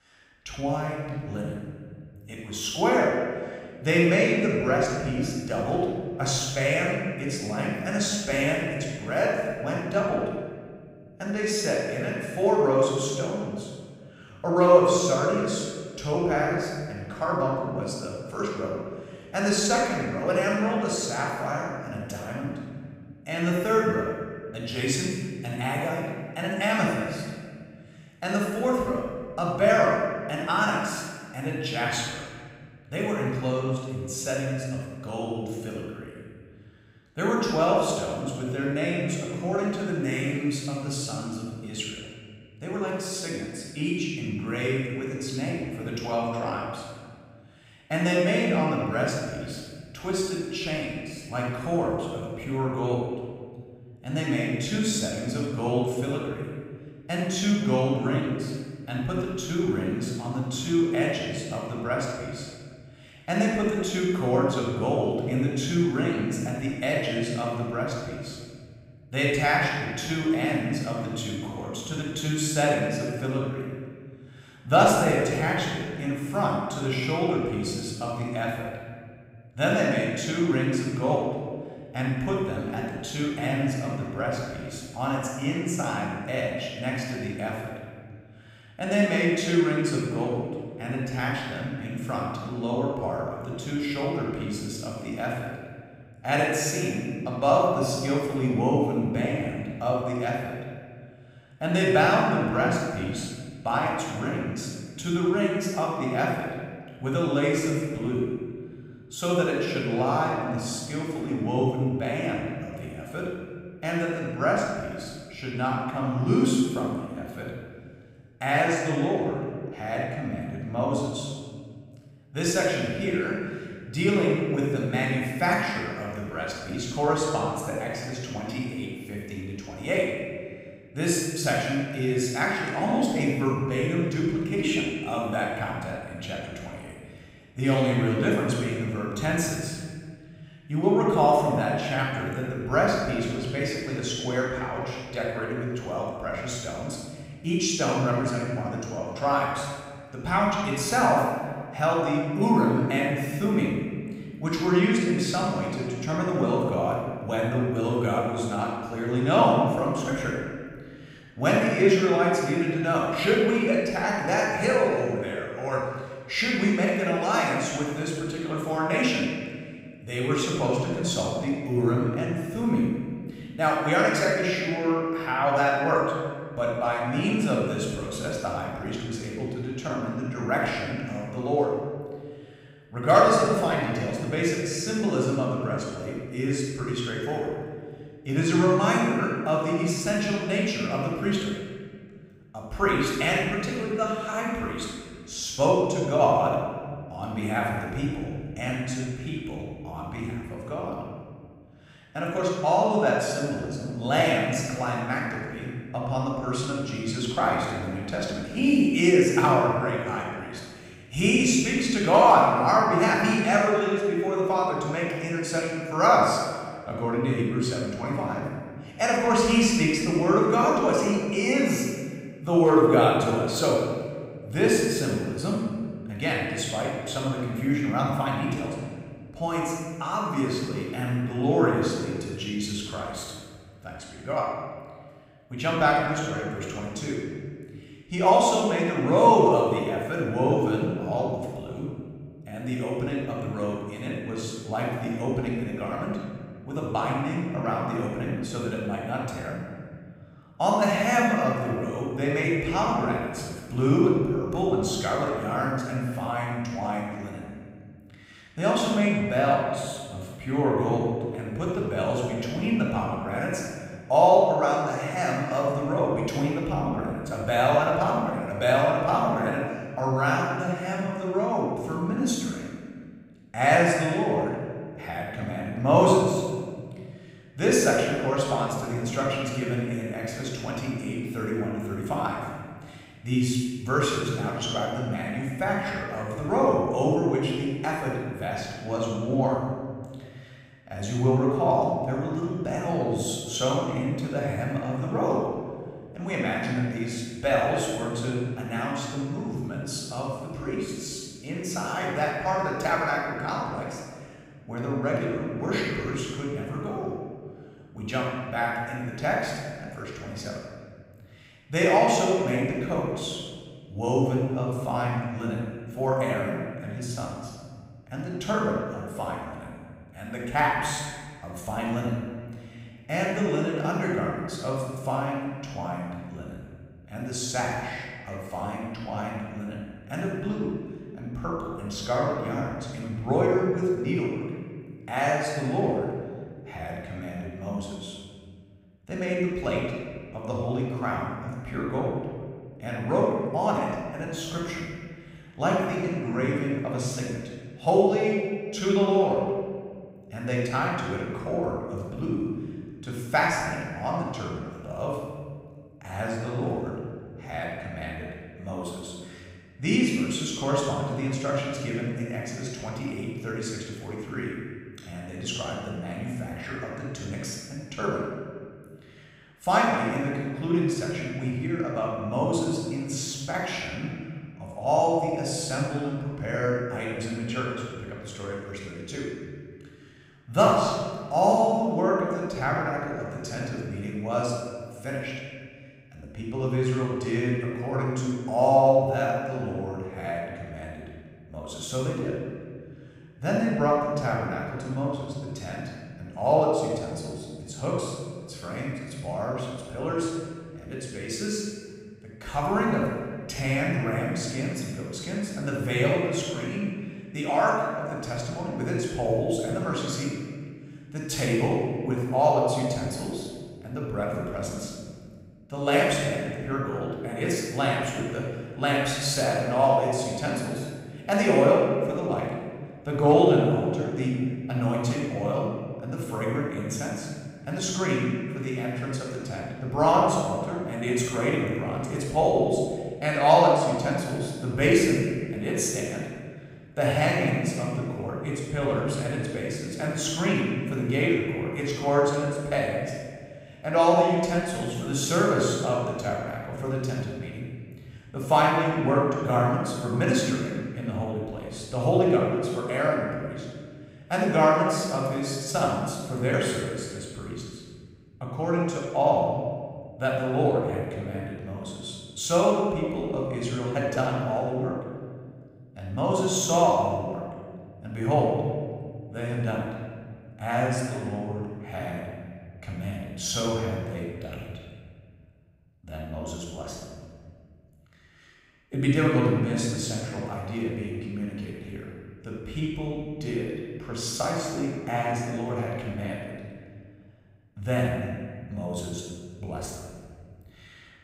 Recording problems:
room echo; strong; dies away in 1.8 s
off-mic speech; far

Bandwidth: 15.5 kHz